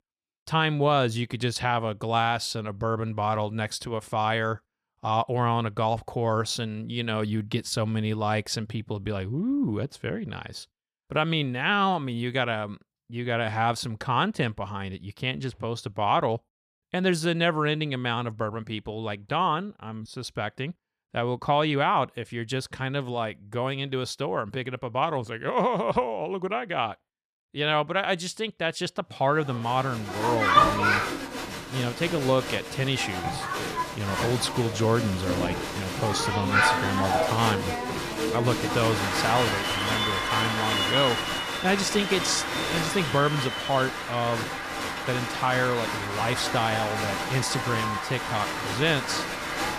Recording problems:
crowd noise; very loud; from 30 s on; as loud as the speech

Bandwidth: 14.5 kHz